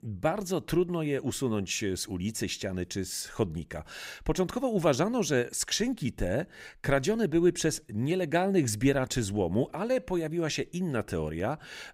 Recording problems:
none

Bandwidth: 15.5 kHz